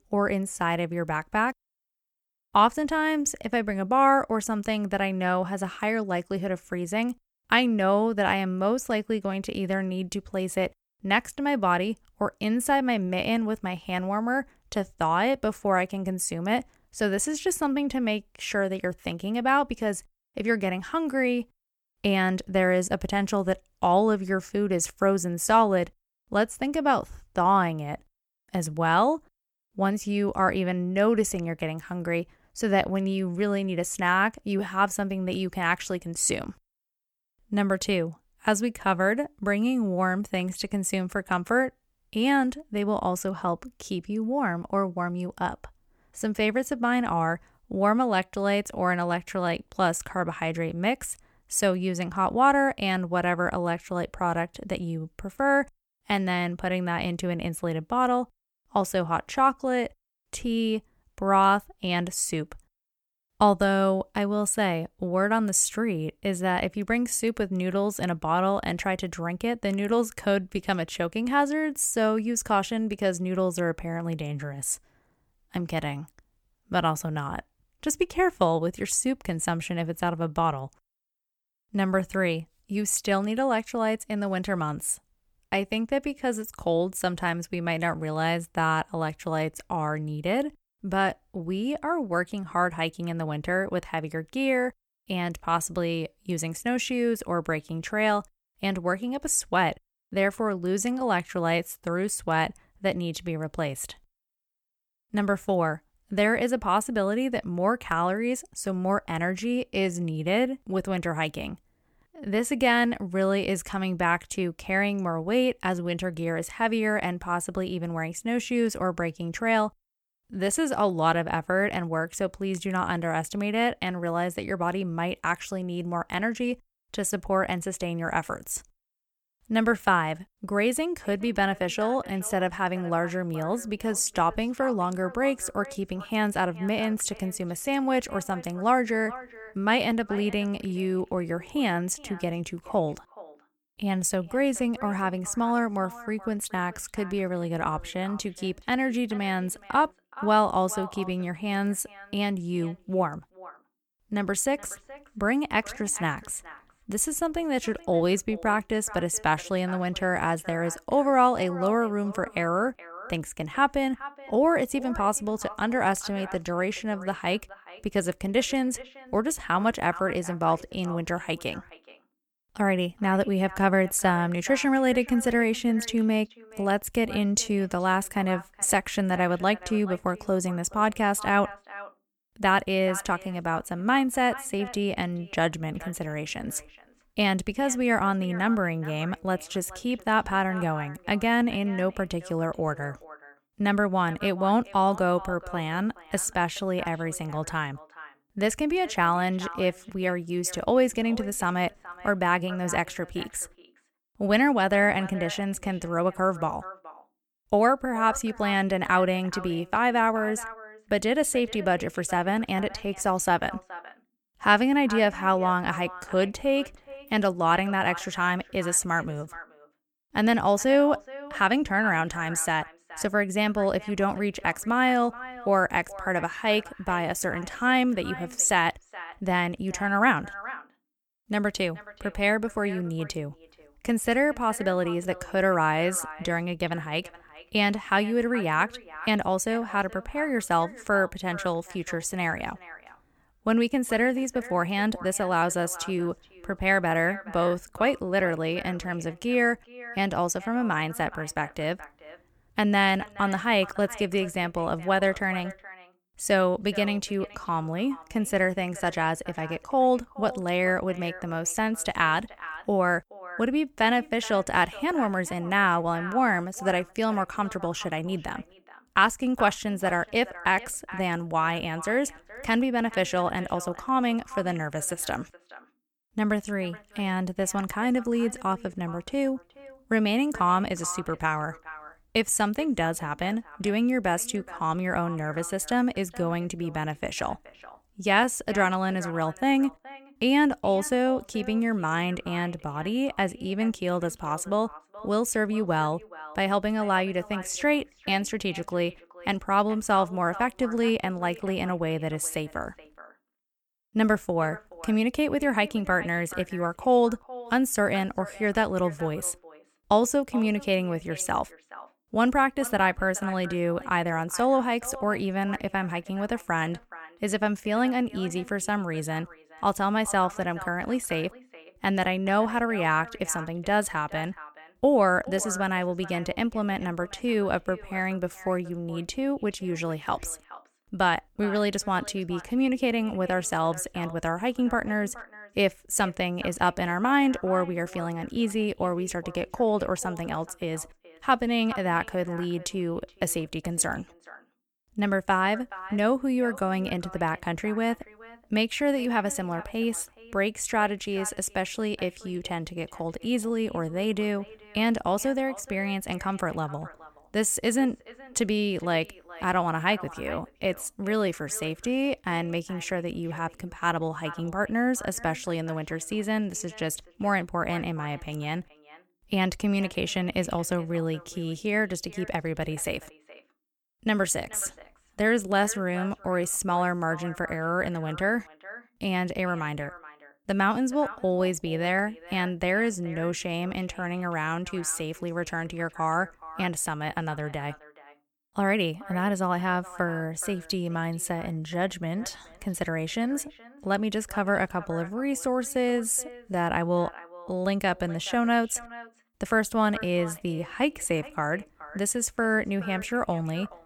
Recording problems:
echo of what is said; faint; from 2:11 on; 420 ms later, 20 dB below the speech

